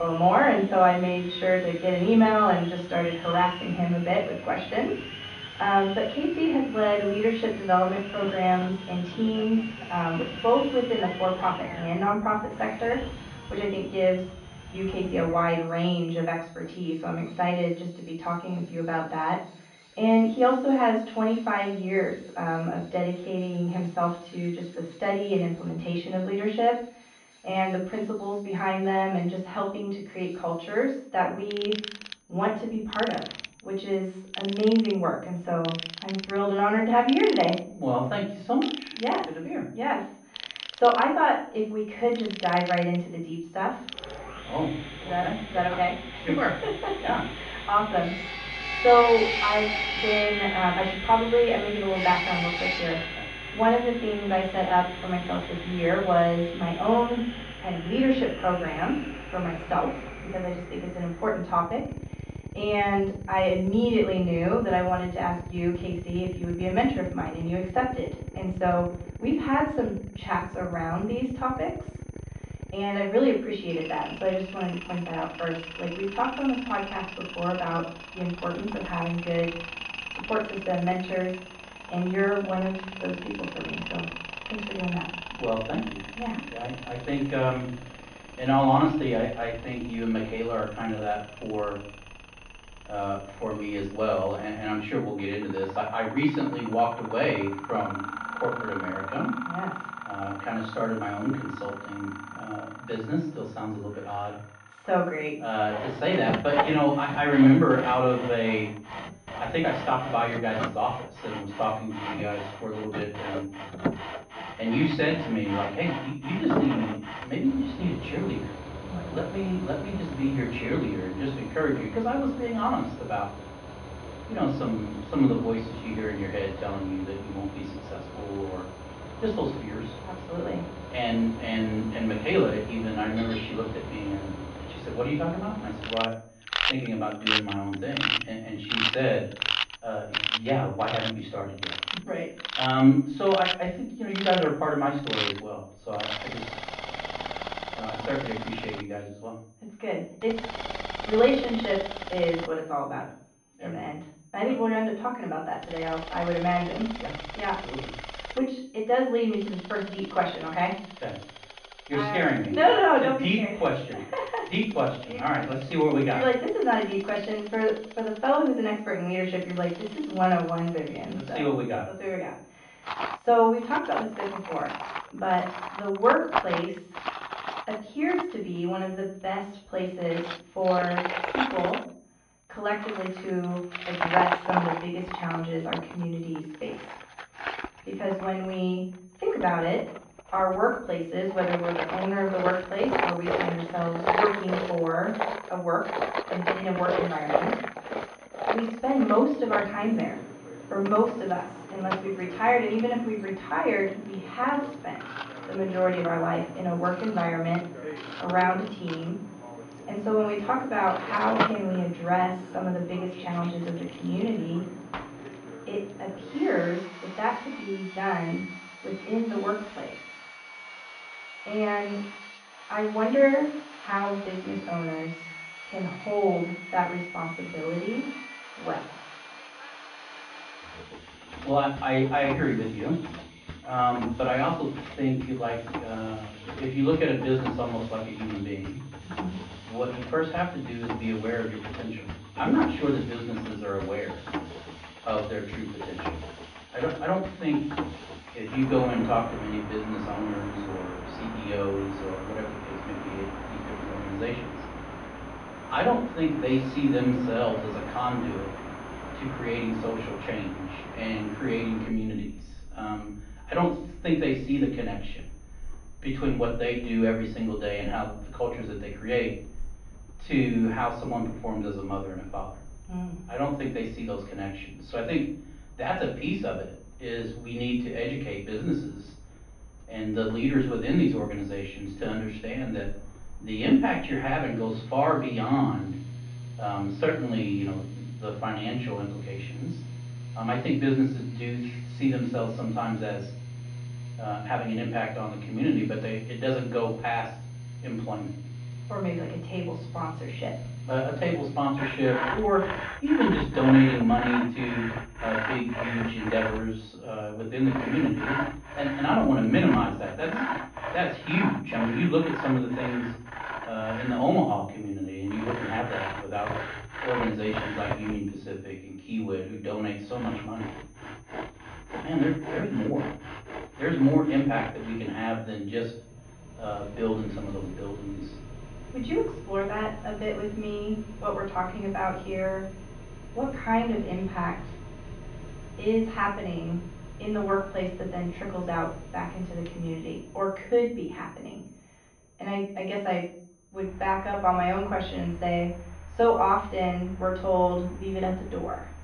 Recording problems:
off-mic speech; far
muffled; very; fading above 3.5 kHz
room echo; slight; dies away in 0.4 s
machinery noise; loud; throughout; 8 dB below the speech
high-pitched whine; faint; throughout; 6.5 kHz, 35 dB below the speech
abrupt cut into speech; at the start

